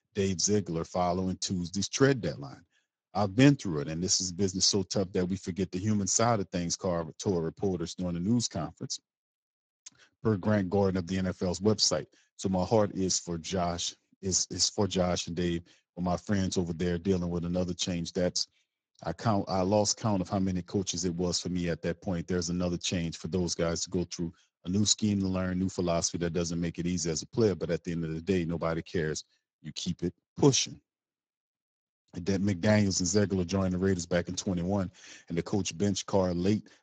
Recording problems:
garbled, watery; badly

